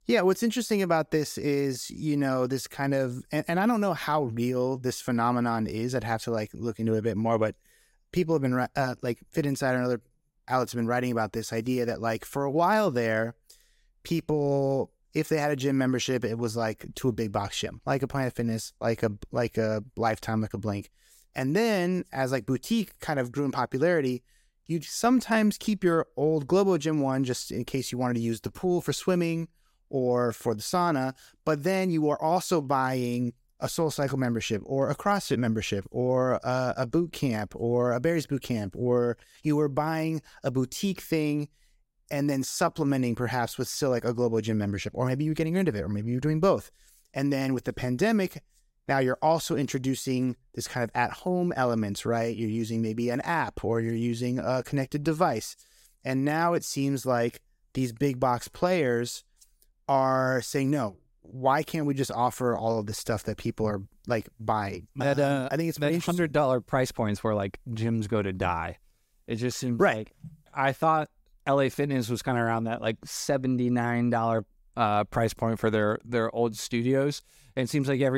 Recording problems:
abrupt cut into speech; at the end

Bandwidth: 16 kHz